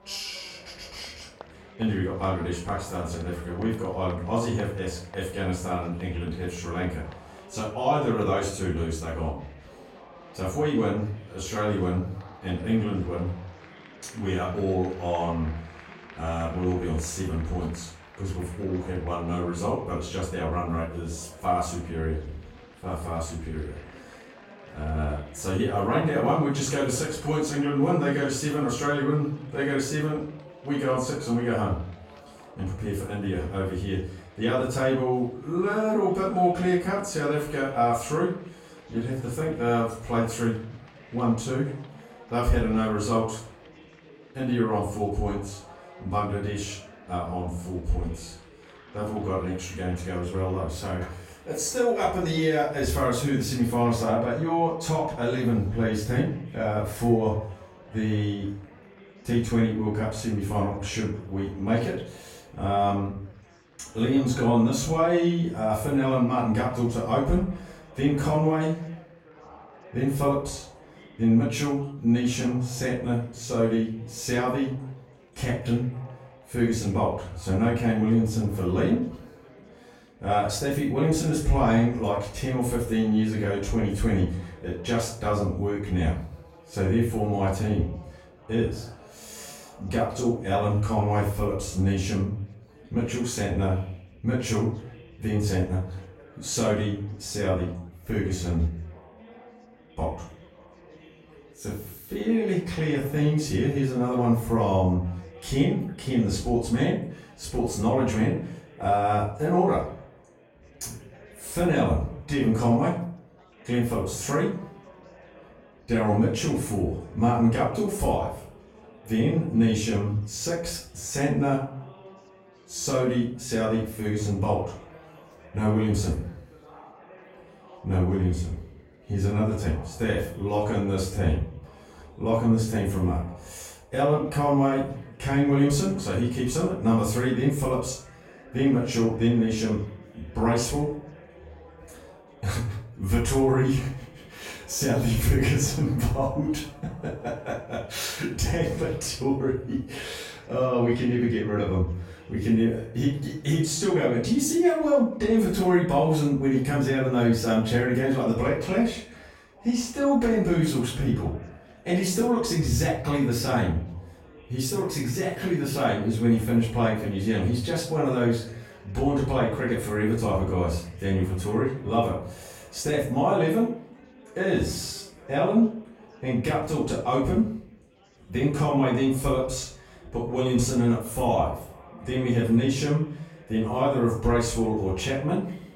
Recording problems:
off-mic speech; far
room echo; noticeable; dies away in 0.4 s
chatter from many people; faint; throughout; 25 dB below the speech

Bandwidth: 16 kHz